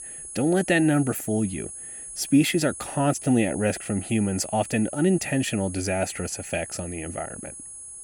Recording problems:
high-pitched whine; noticeable; throughout; 10 kHz, 10 dB below the speech

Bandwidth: 17.5 kHz